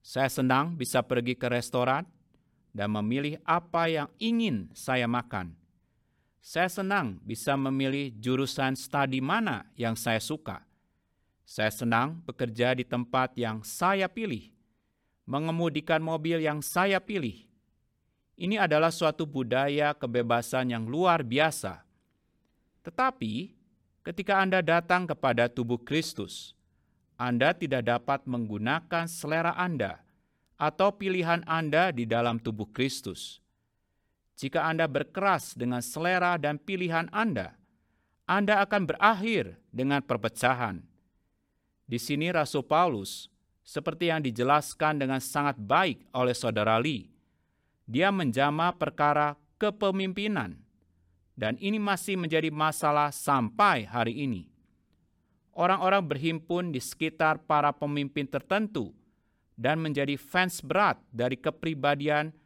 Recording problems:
none

